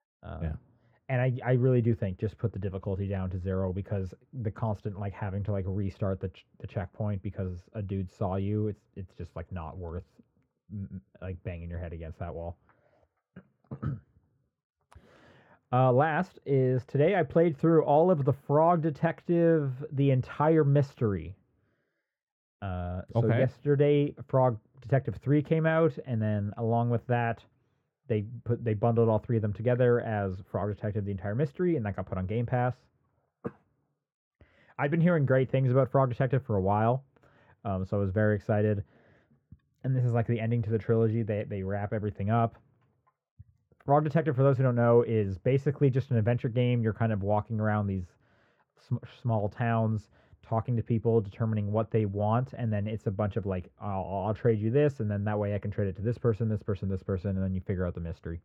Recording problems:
muffled; very; fading above 3 kHz

